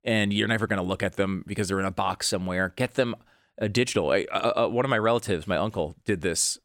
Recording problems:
none

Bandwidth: 17 kHz